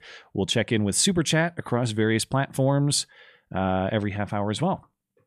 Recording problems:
none

